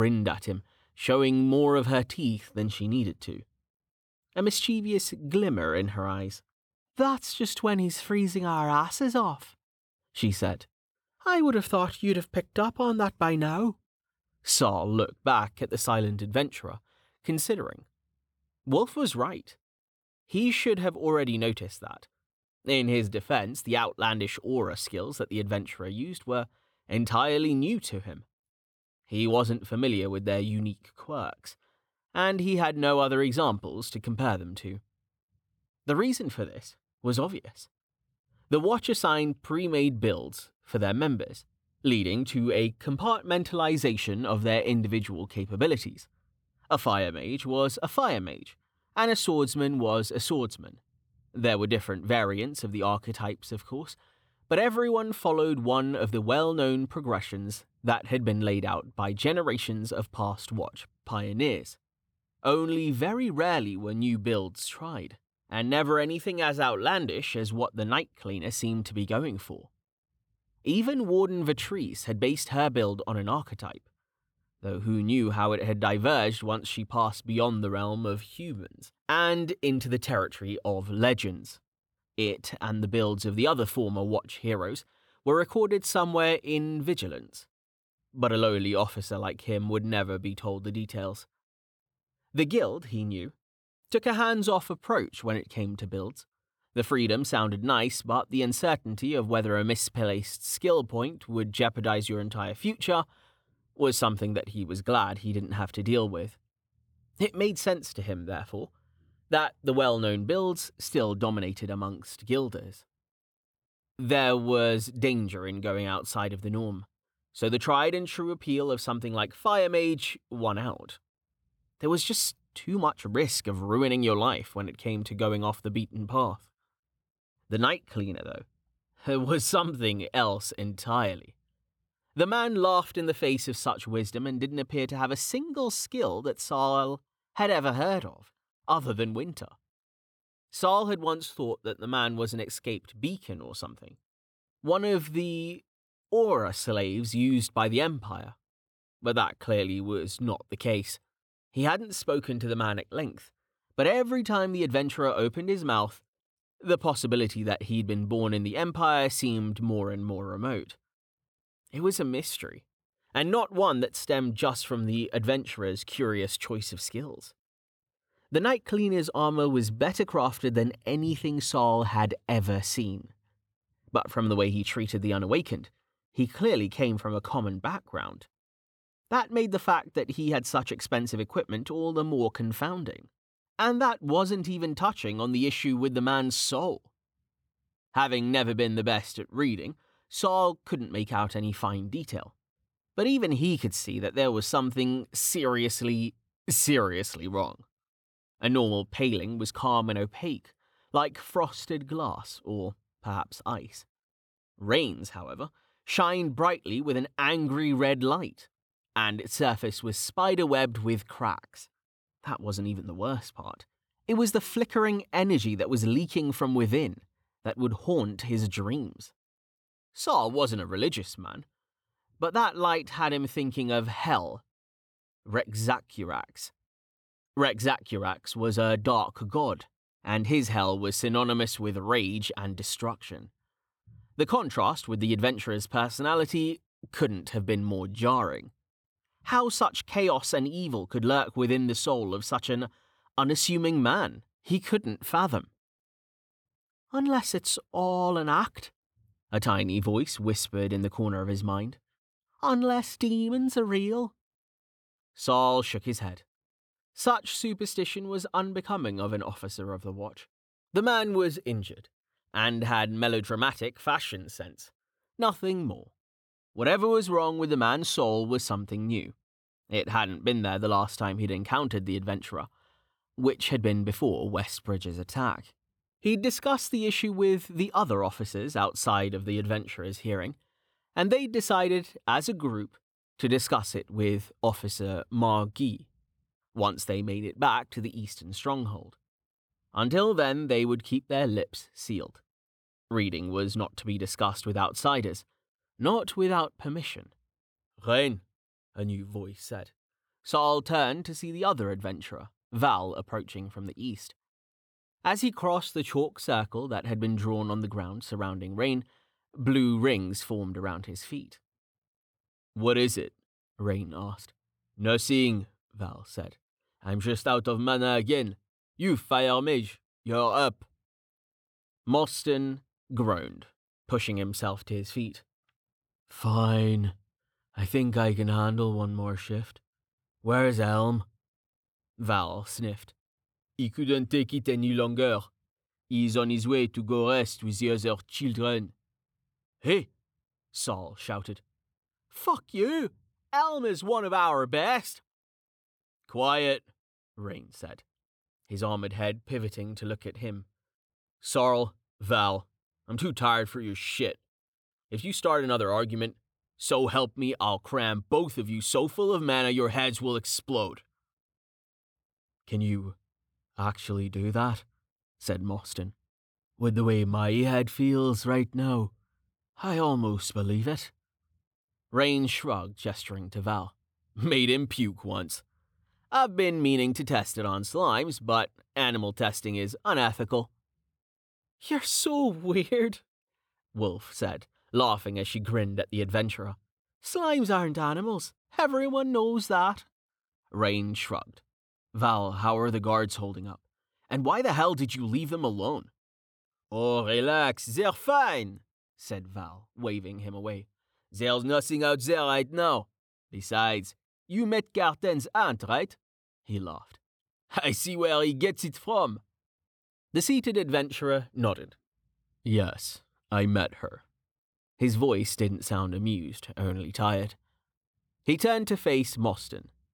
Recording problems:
abrupt cut into speech; at the start

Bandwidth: 18.5 kHz